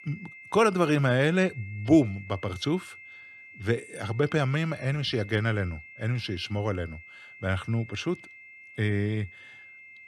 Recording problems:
high-pitched whine; noticeable; throughout; 2 kHz, 20 dB below the speech

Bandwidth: 14 kHz